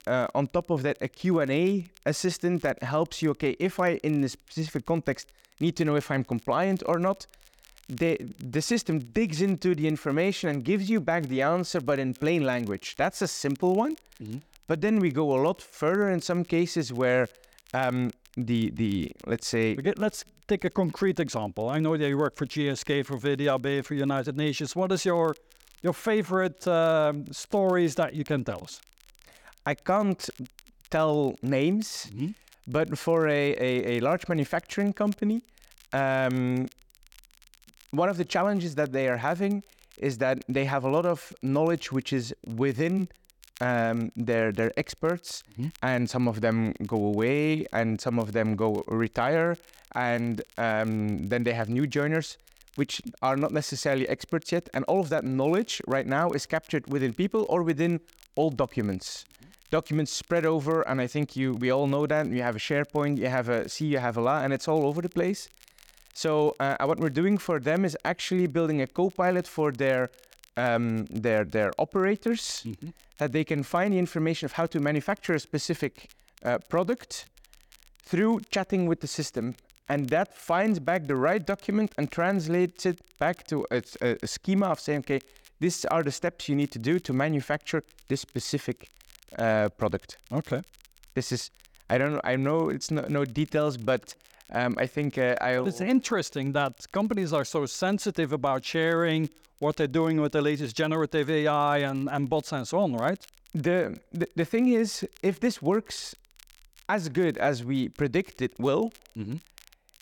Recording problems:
crackle, like an old record; faint; 30 dB below the speech

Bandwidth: 18 kHz